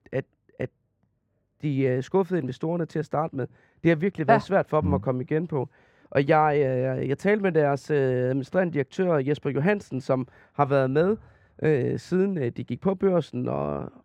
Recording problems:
muffled; very; fading above 3.5 kHz

